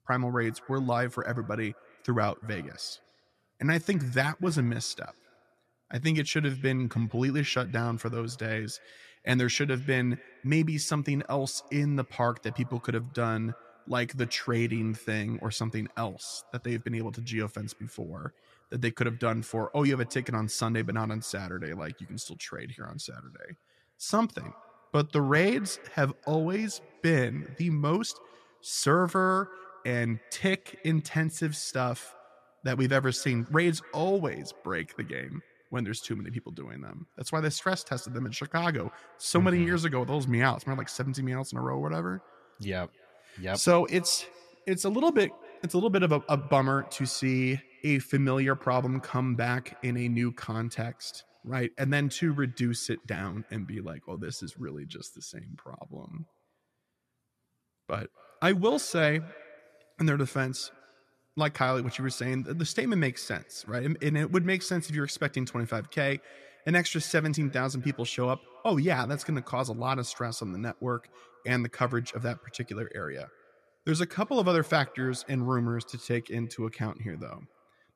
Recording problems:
echo of what is said; faint; throughout; 250 ms later, 25 dB below the speech

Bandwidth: 13.5 kHz